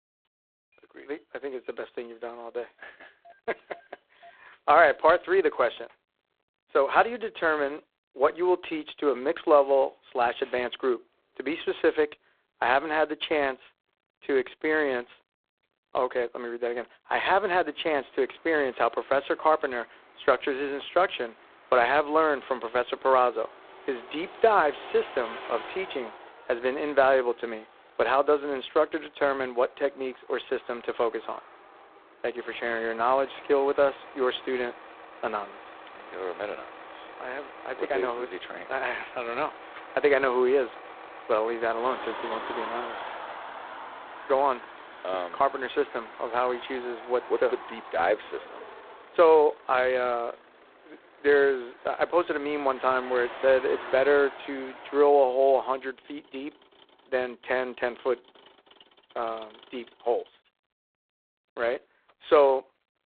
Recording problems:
phone-call audio; poor line; nothing above 4 kHz
traffic noise; noticeable; throughout; 15 dB below the speech

